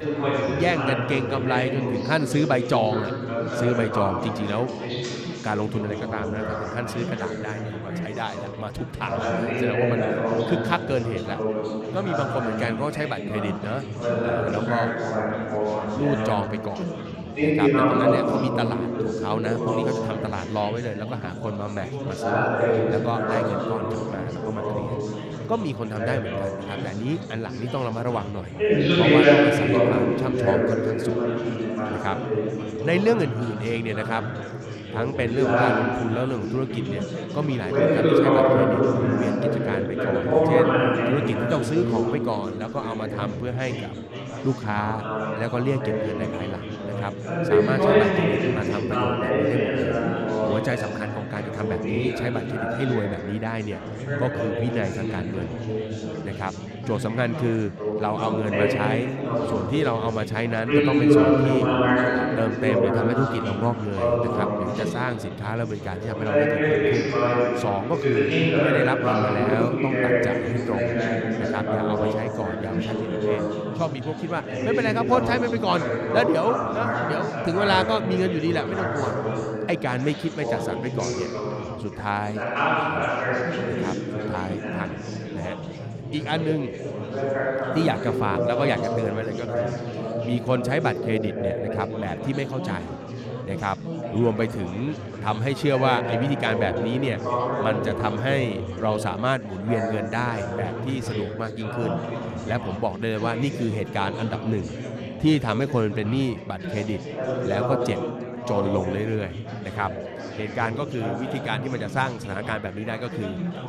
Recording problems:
chatter from many people; very loud; throughout; 2 dB above the speech

